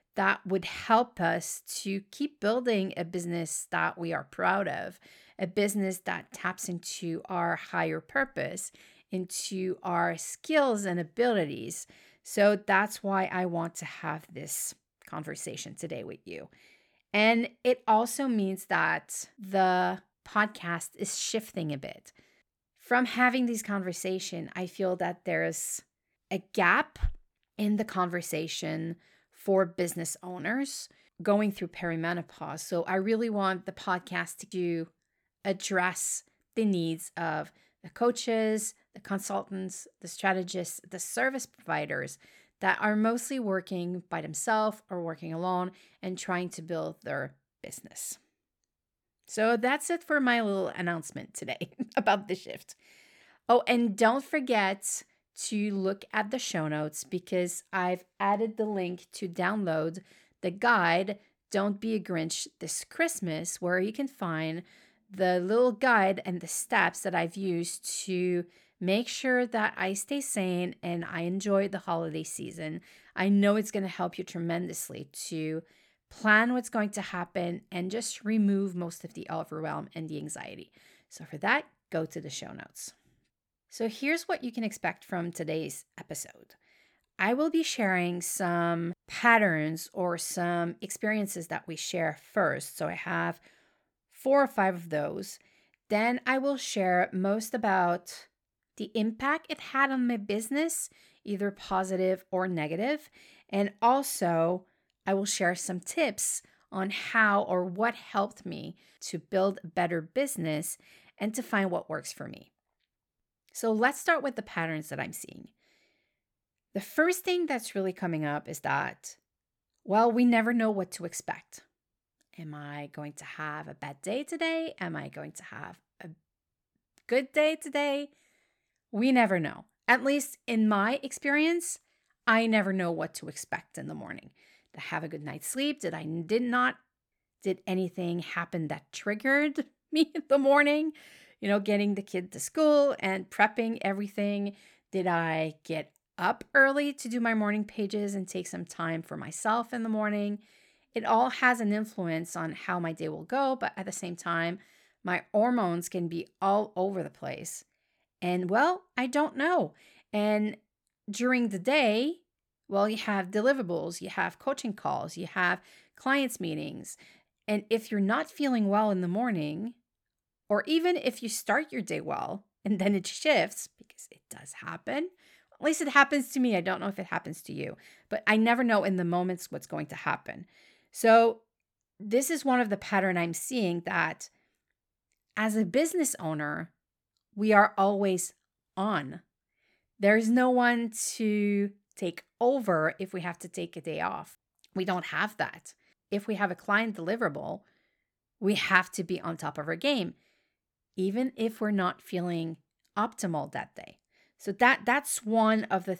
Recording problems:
none

